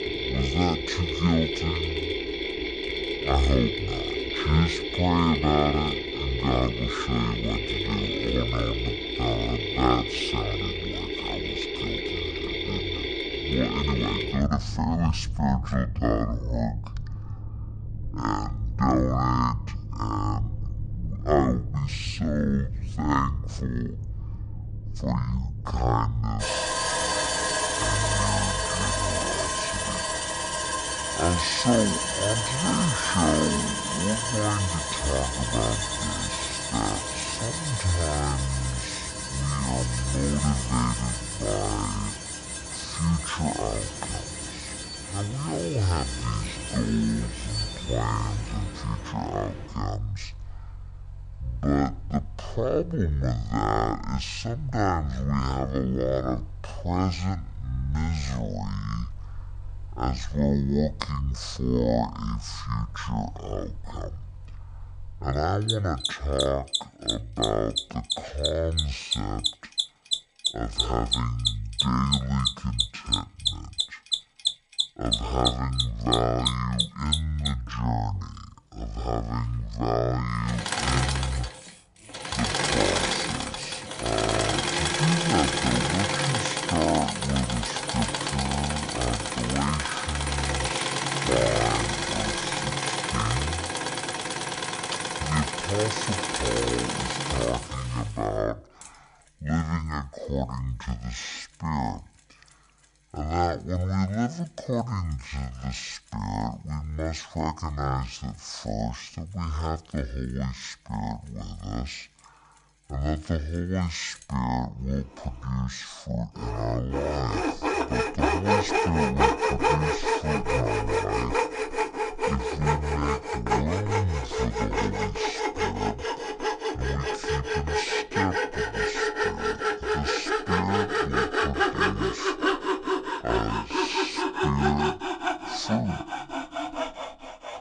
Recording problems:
wrong speed and pitch; too slow and too low; 0.5 times normal speed
machinery noise; very loud; throughout; as loud as the speech

